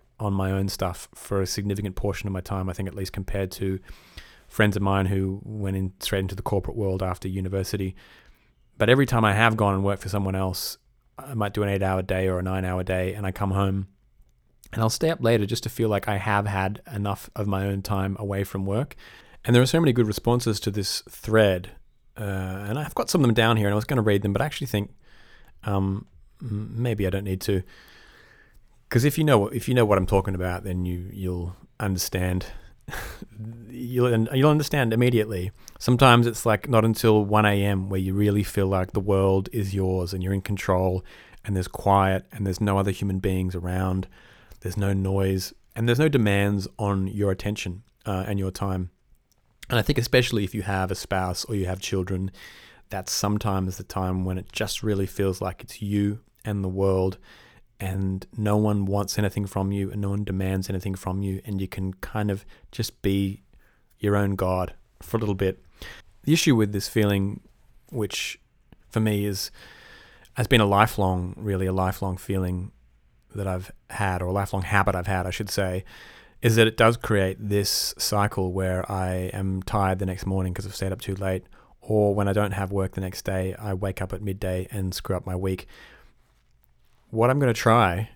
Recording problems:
none

